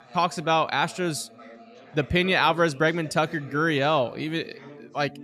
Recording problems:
background chatter; faint; throughout; 4 voices, 20 dB below the speech

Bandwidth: 13.5 kHz